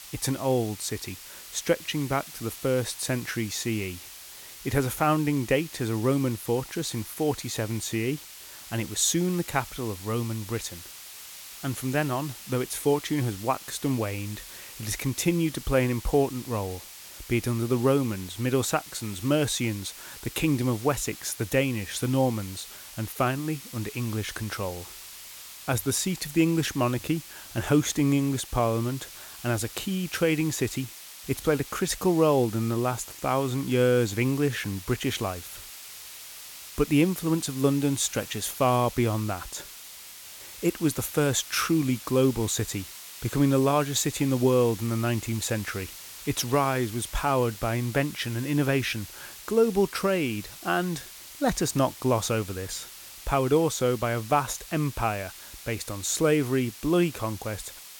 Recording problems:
hiss; noticeable; throughout; 15 dB below the speech

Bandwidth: 17 kHz